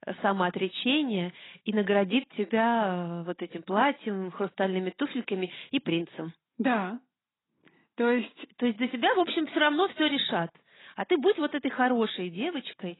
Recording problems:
garbled, watery; badly; nothing above 4 kHz

